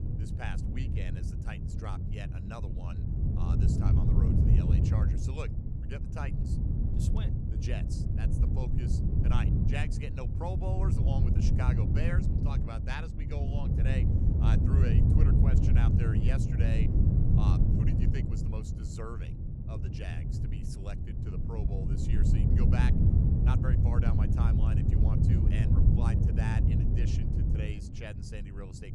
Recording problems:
wind noise on the microphone; heavy; 2 dB above the speech

